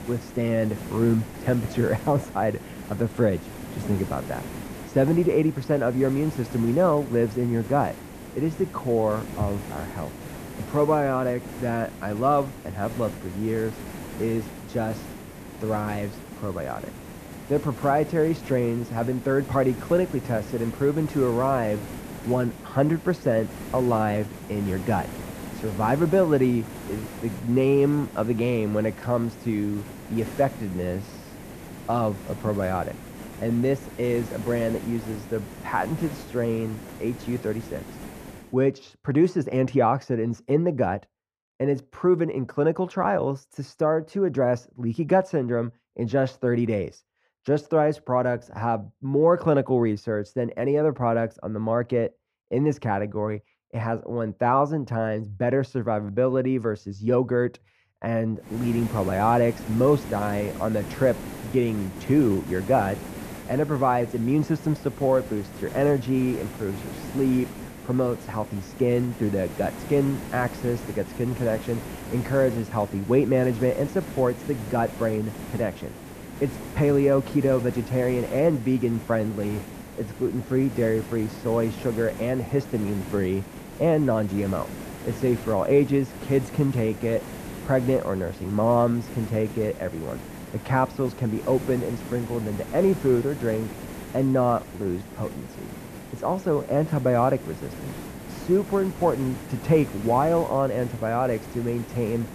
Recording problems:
muffled; slightly; fading above 2 kHz
hiss; noticeable; until 38 s and from 59 s on; 15 dB below the speech

